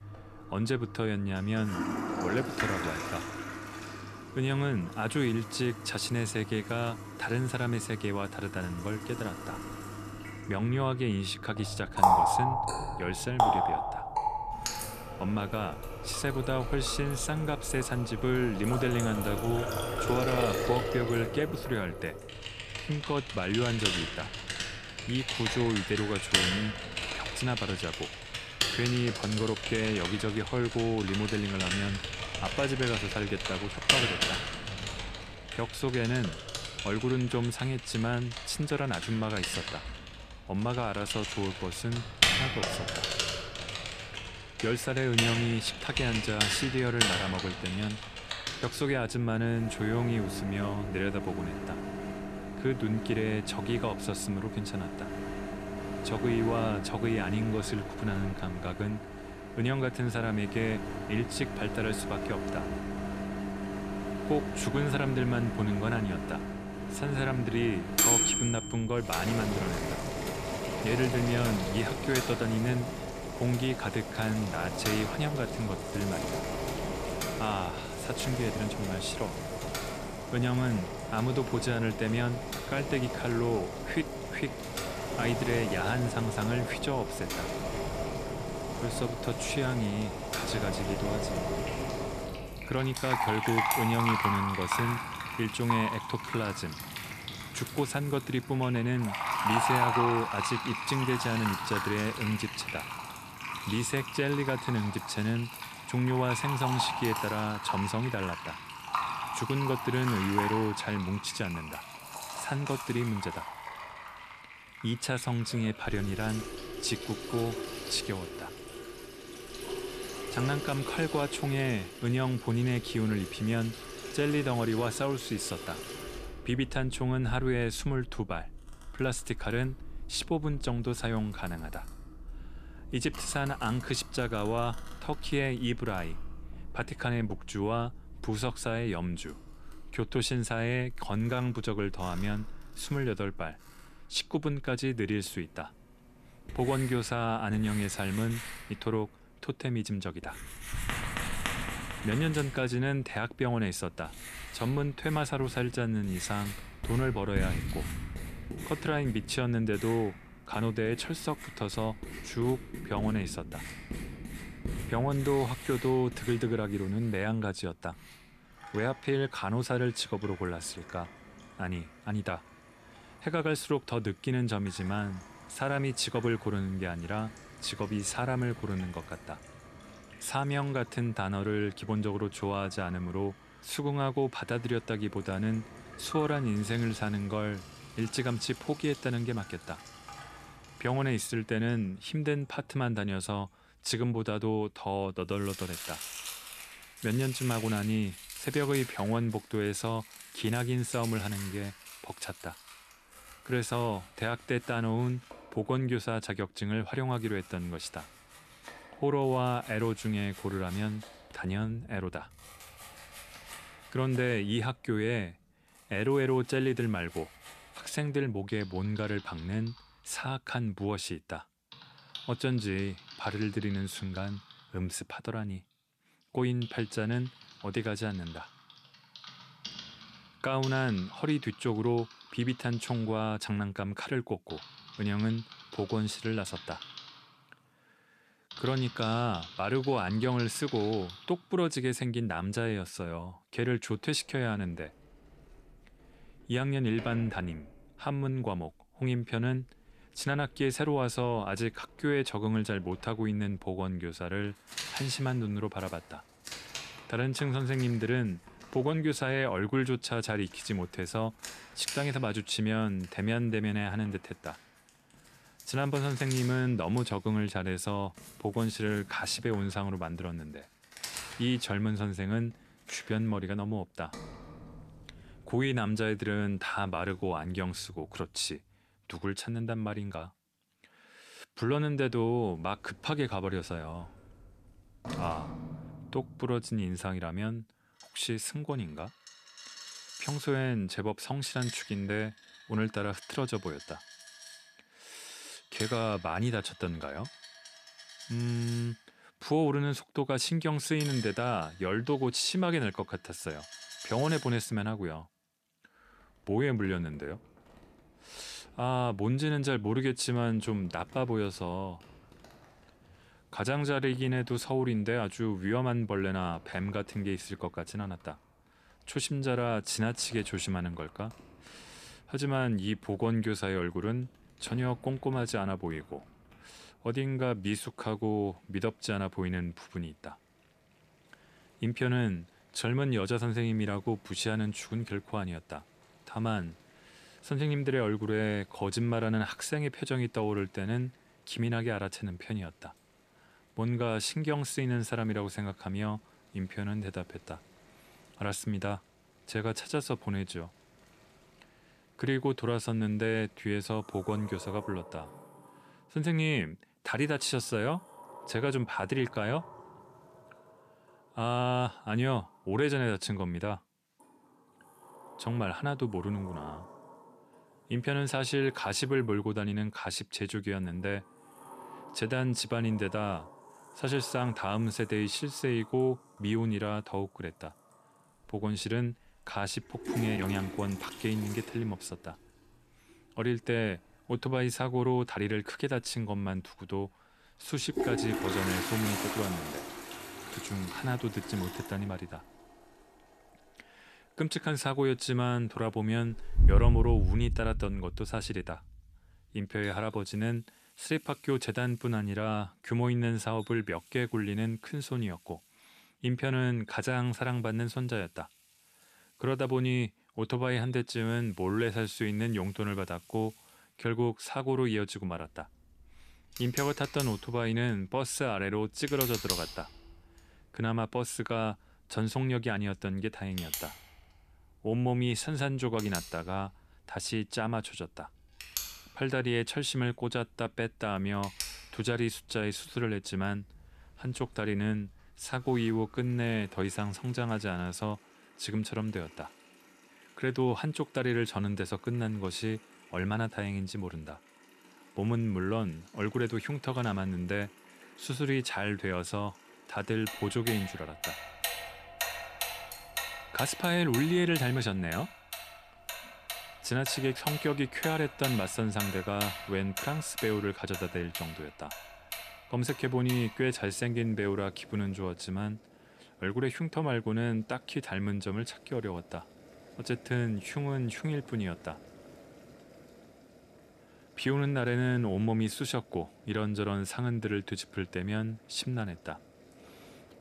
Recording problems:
household noises; loud; throughout; 4 dB below the speech

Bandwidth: 14.5 kHz